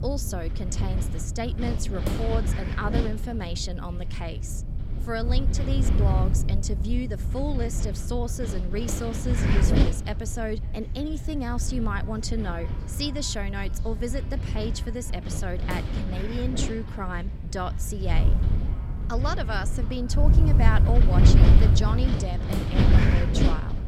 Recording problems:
echo of what is said; faint; from 10 s on; 550 ms later, 20 dB below the speech
wind noise on the microphone; heavy; 2 dB below the speech

